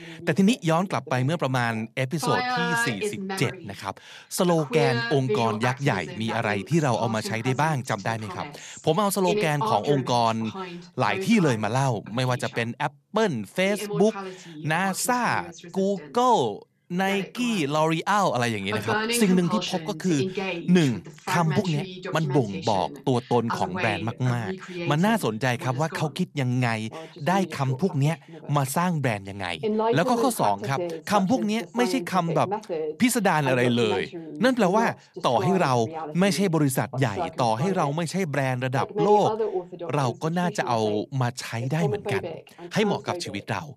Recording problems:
voice in the background; loud; throughout; 7 dB below the speech

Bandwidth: 14 kHz